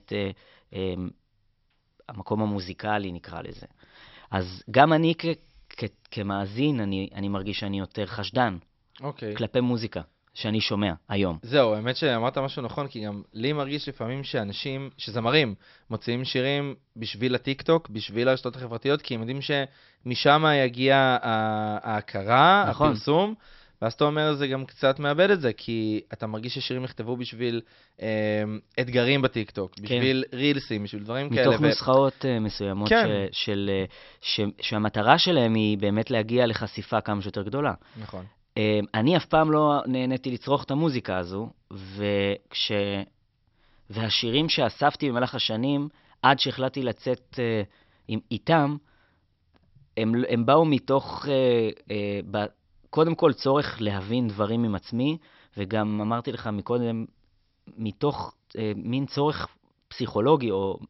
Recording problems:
high frequencies cut off; noticeable; nothing above 5.5 kHz

